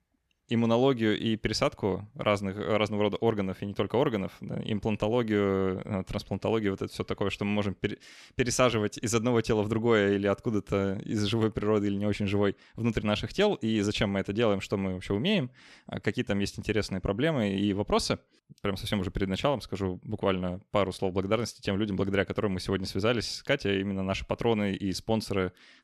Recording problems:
none

